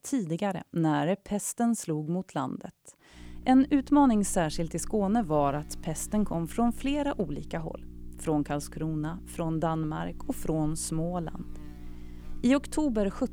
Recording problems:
electrical hum; faint; from 3 s on; 60 Hz, 25 dB below the speech

